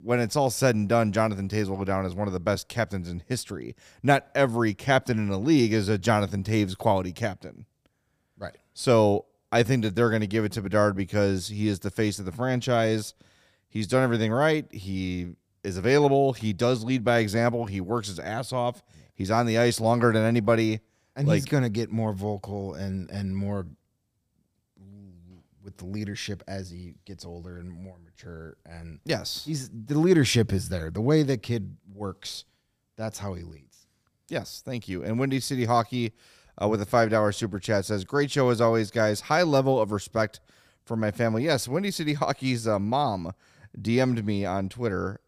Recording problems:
none

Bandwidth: 15 kHz